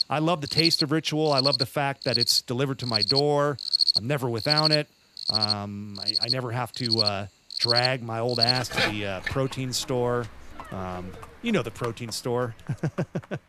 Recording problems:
animal sounds; very loud; throughout; 3 dB above the speech

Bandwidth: 14.5 kHz